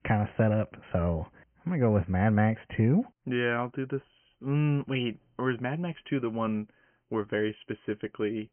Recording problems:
high frequencies cut off; severe; nothing above 3 kHz

